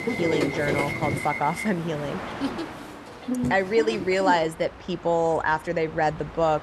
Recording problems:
train or aircraft noise; loud; throughout; 5 dB below the speech

